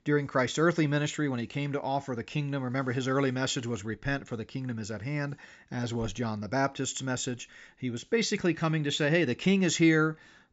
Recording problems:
high frequencies cut off; noticeable; nothing above 8 kHz

